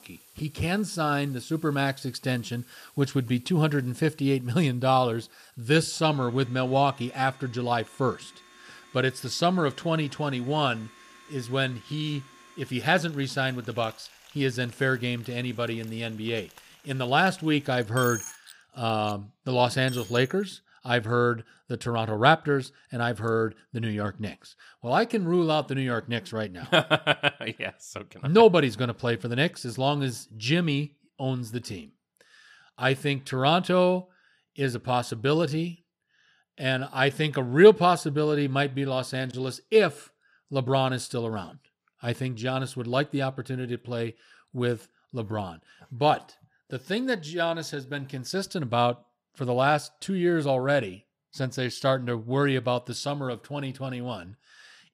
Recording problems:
household noises; faint; until 20 s; 20 dB below the speech

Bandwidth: 15 kHz